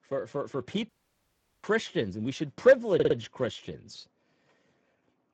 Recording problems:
garbled, watery; badly; nothing above 7.5 kHz
audio cutting out; at 1 s for 0.5 s
audio stuttering; at 3 s

